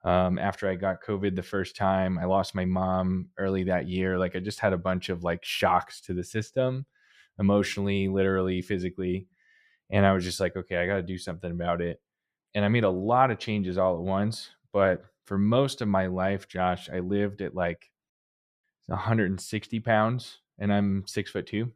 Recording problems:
none

